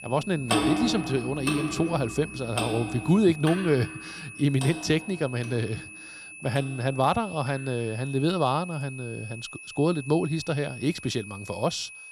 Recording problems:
household noises; loud; throughout; 5 dB below the speech
high-pitched whine; noticeable; throughout; 2.5 kHz, 15 dB below the speech

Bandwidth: 14.5 kHz